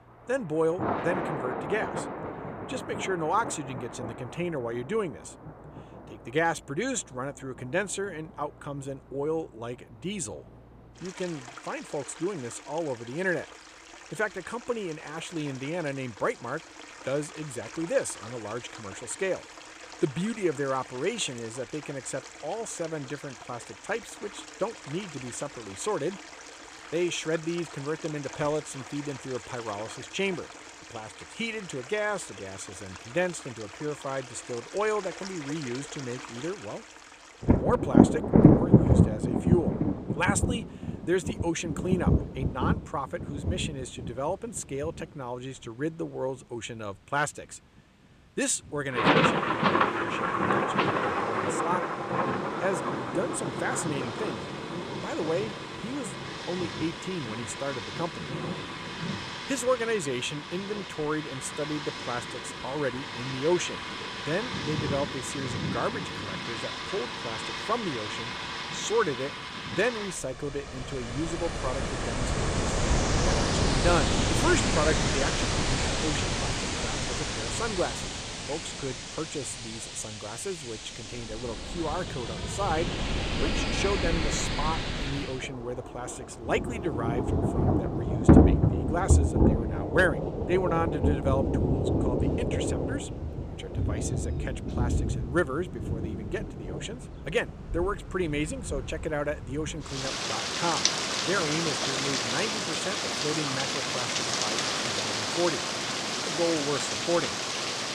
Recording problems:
rain or running water; very loud; throughout; 4 dB above the speech

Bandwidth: 14.5 kHz